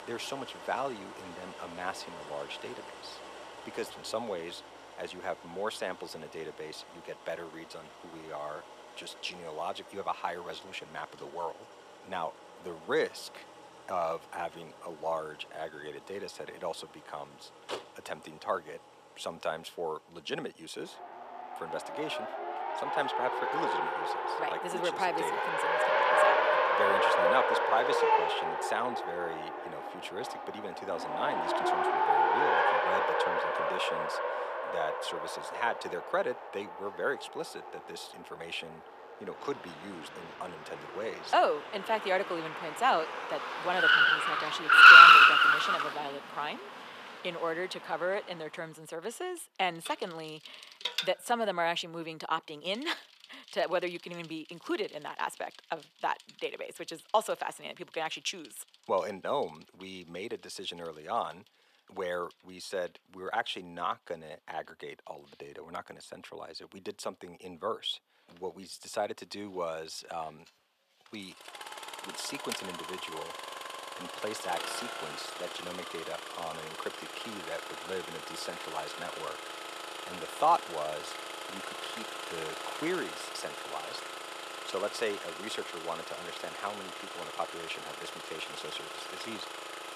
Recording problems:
thin; very; fading below 500 Hz
traffic noise; very loud; throughout; 9 dB above the speech

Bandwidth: 14.5 kHz